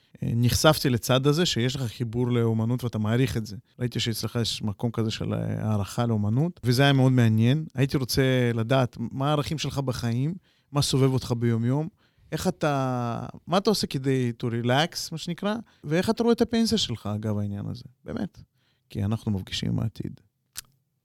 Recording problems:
none

